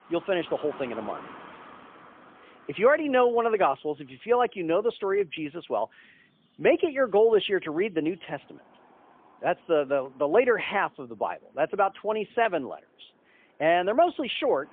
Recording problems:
phone-call audio; poor line; nothing above 3.5 kHz
traffic noise; faint; throughout; 25 dB below the speech

